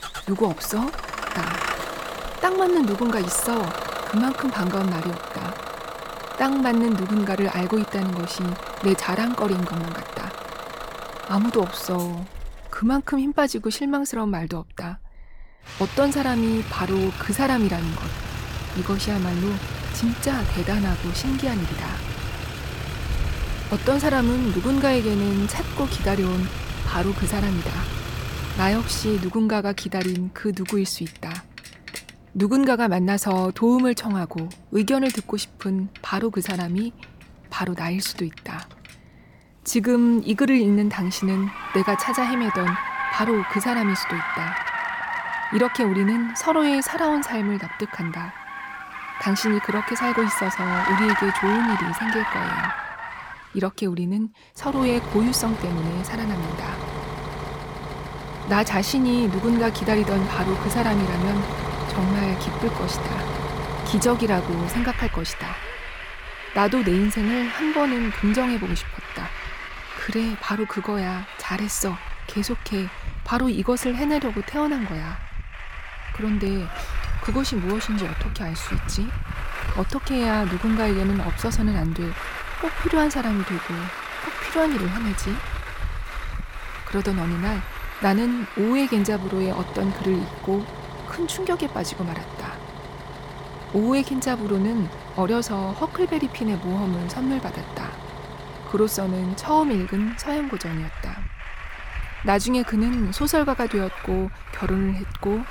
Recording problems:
traffic noise; loud; throughout; 7 dB below the speech

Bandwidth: 18 kHz